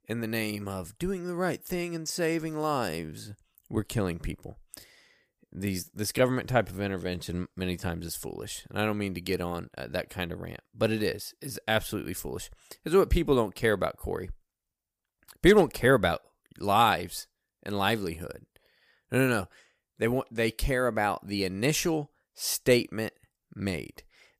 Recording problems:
none

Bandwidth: 15 kHz